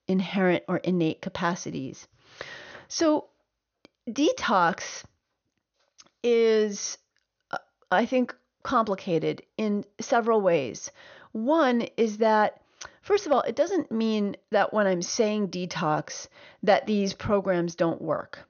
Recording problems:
high frequencies cut off; noticeable; nothing above 6.5 kHz

